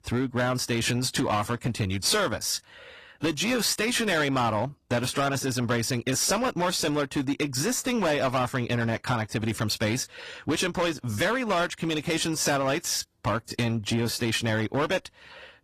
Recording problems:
distortion; slight; 10% of the sound clipped
garbled, watery; slightly; nothing above 14.5 kHz

